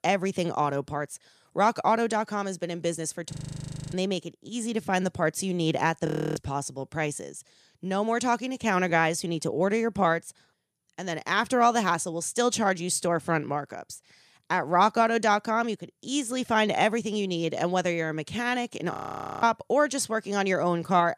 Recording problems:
audio freezing; at 3.5 s for 0.5 s, at 6 s and at 19 s for 0.5 s

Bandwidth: 14.5 kHz